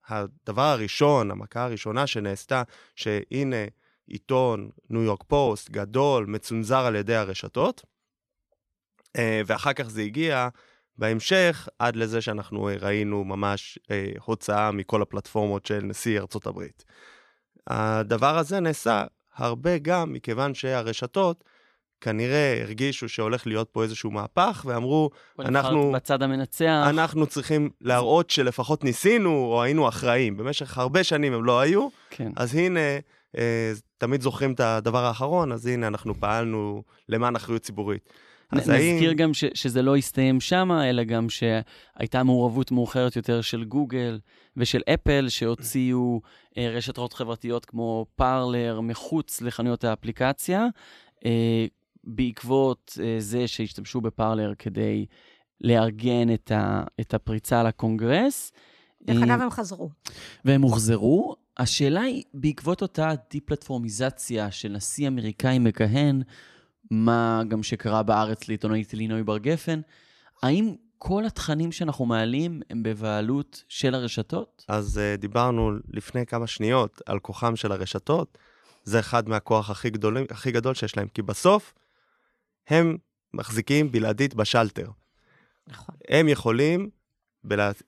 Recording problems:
none

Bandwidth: 13.5 kHz